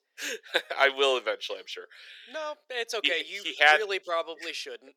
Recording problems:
thin; very; fading below 400 Hz

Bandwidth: 18 kHz